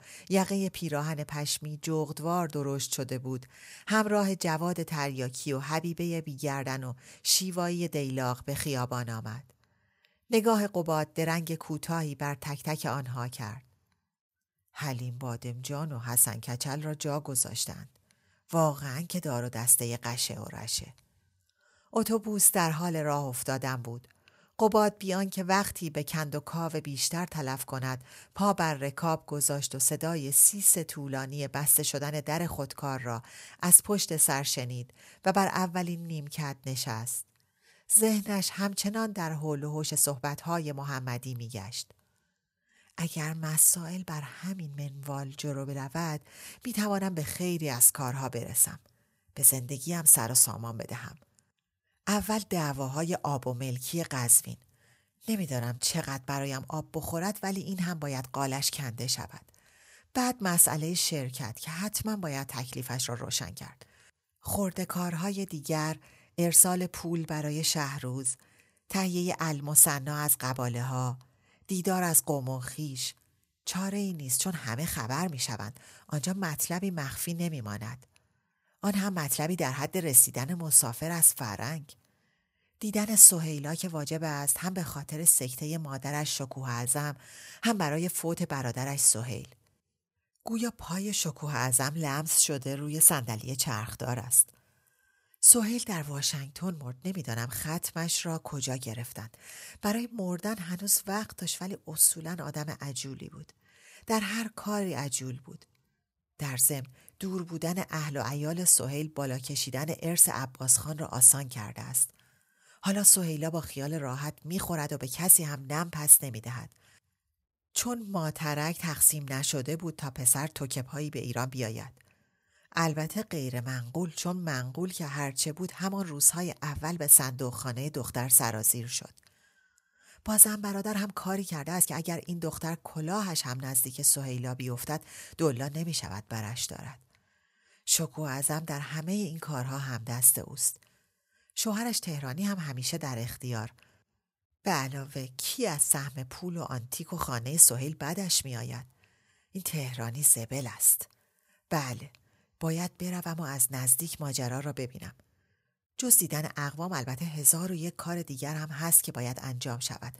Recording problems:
uneven, jittery; strongly; from 19 s to 2:30

